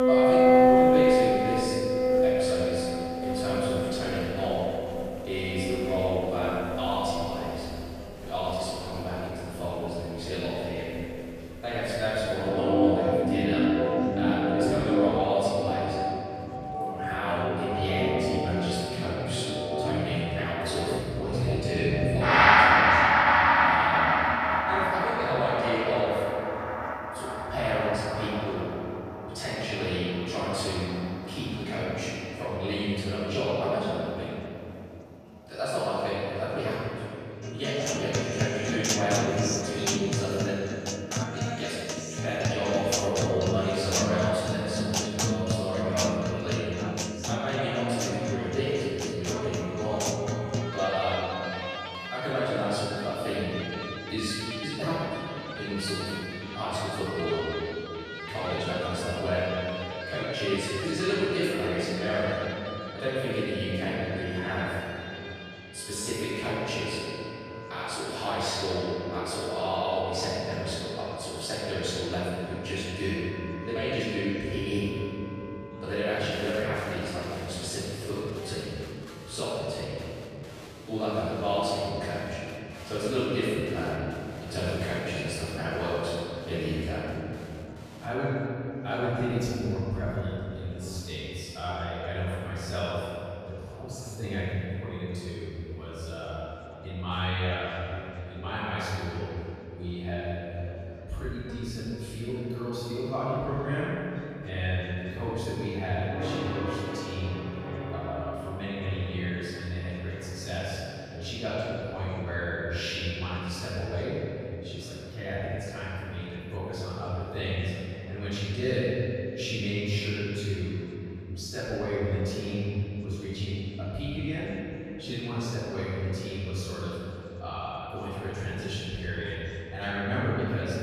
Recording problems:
room echo; strong; dies away in 2.8 s
off-mic speech; far
background music; very loud; throughout; 3 dB above the speech
chatter from many people; faint; throughout; 20 dB below the speech

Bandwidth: 14.5 kHz